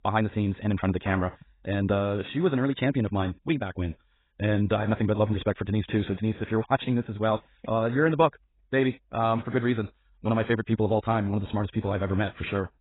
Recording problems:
garbled, watery; badly; nothing above 4 kHz
wrong speed, natural pitch; too fast; 1.5 times normal speed

